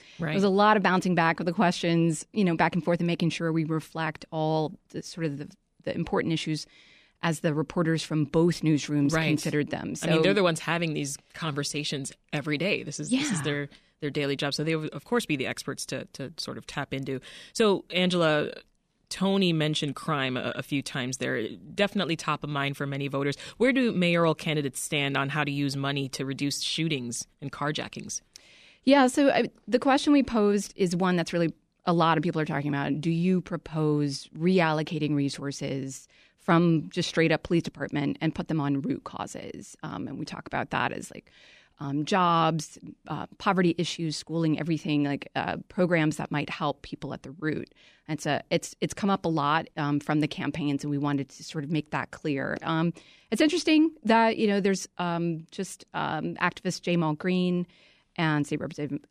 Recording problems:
none

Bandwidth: 14.5 kHz